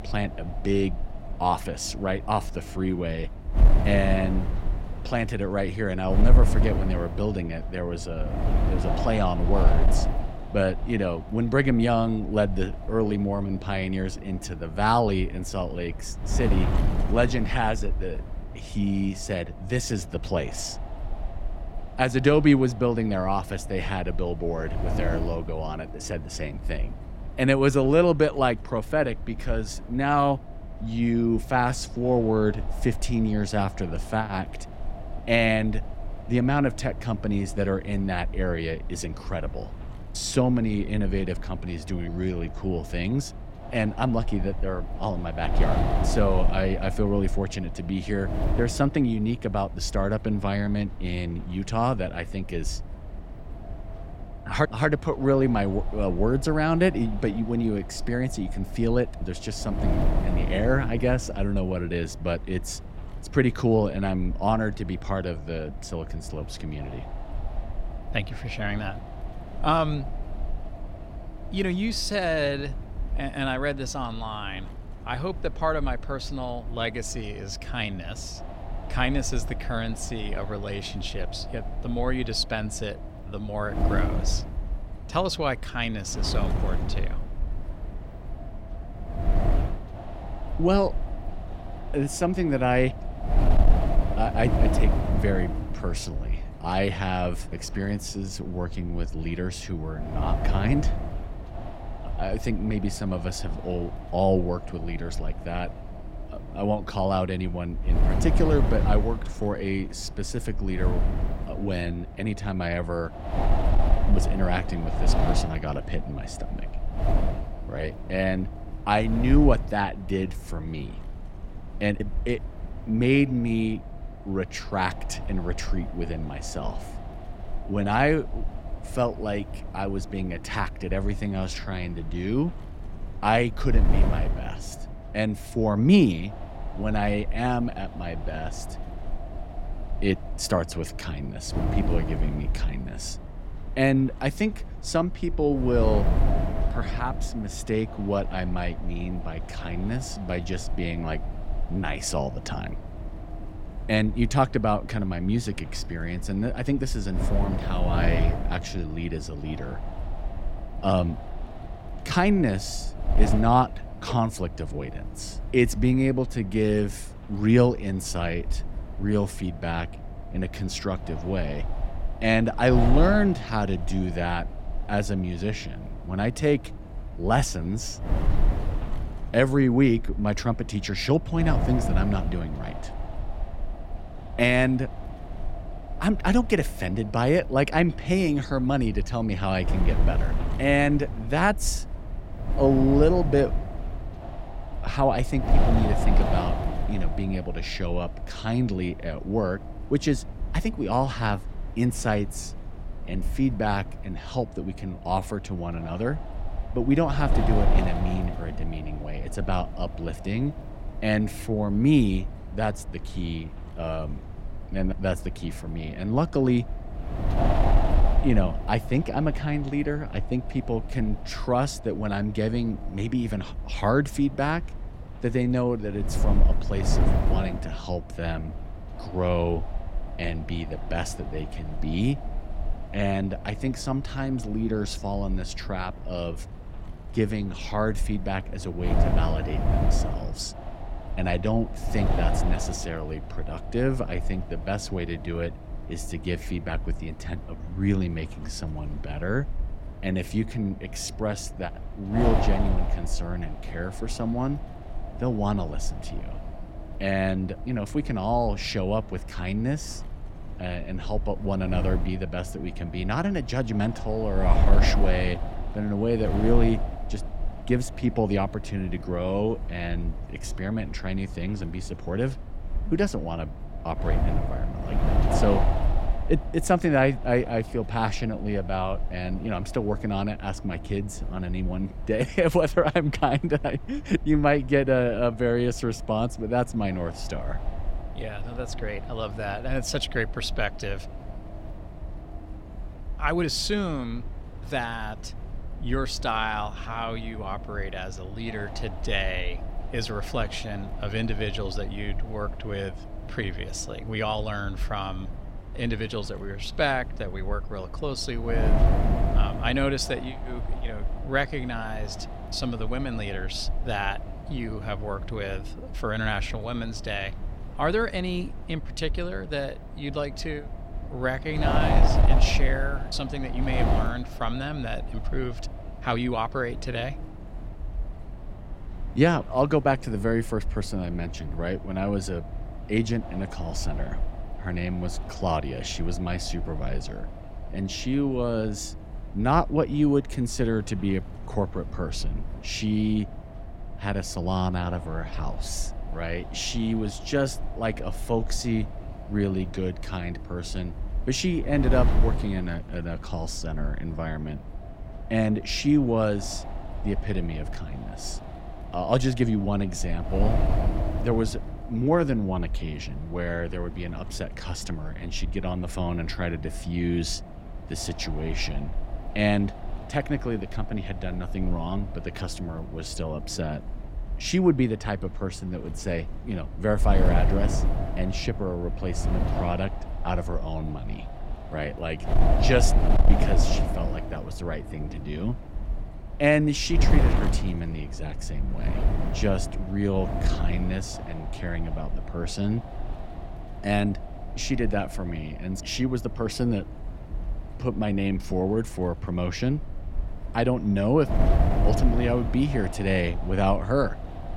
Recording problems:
wind noise on the microphone; occasional gusts; 10 dB below the speech

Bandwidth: 16 kHz